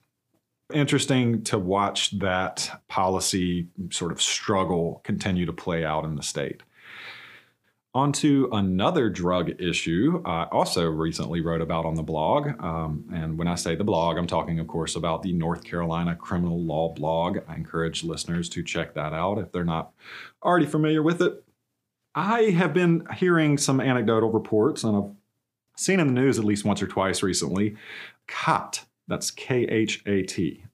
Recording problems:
none

